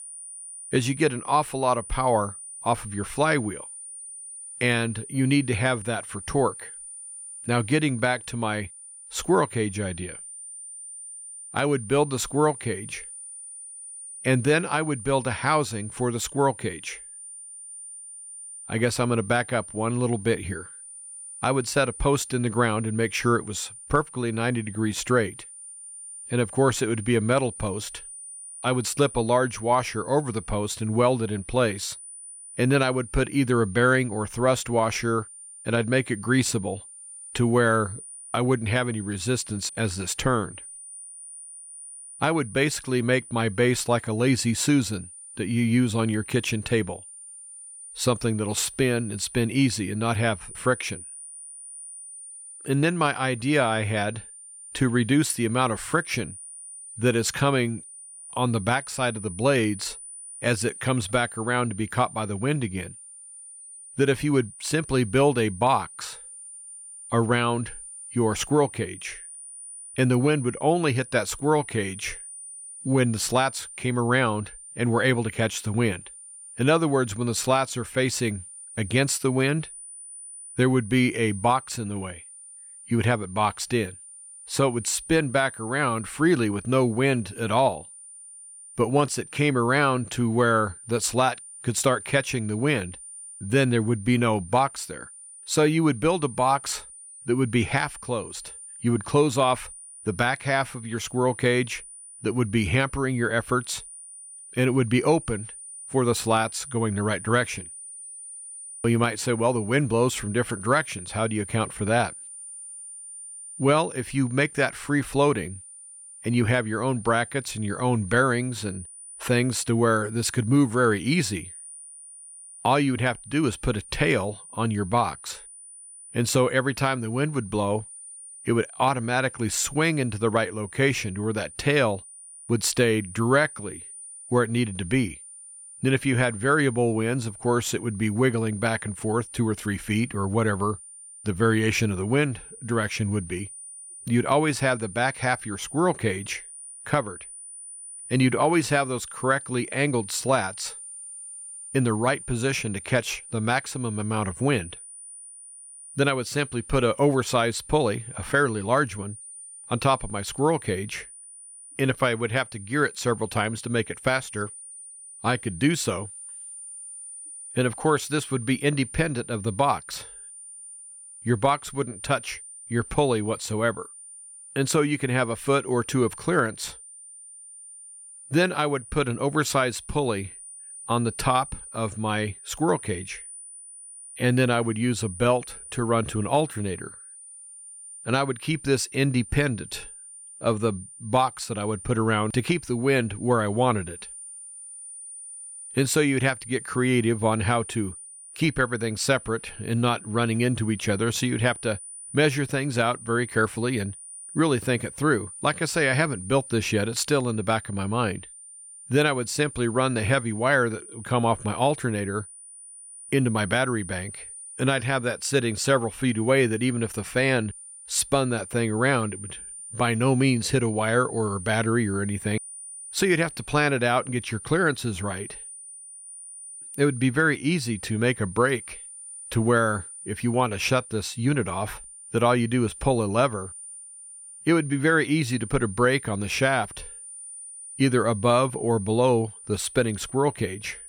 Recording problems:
high-pitched whine; noticeable; throughout; 9 kHz, 15 dB below the speech

